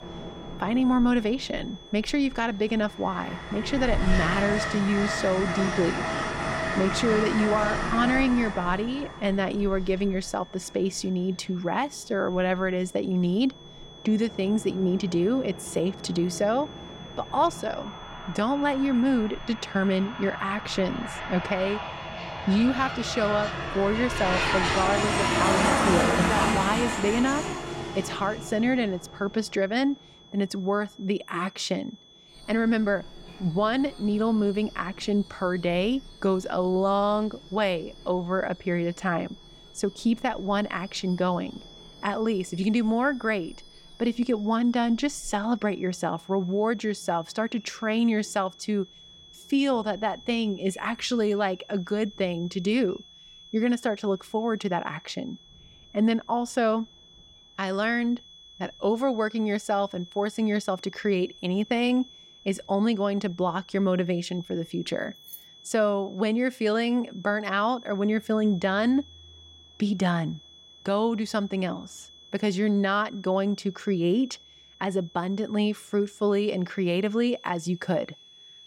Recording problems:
train or aircraft noise; loud; throughout; 3 dB below the speech
high-pitched whine; faint; throughout; 3.5 kHz, 20 dB below the speech
jangling keys; faint; at 1:05; peak 15 dB below the speech

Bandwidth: 16 kHz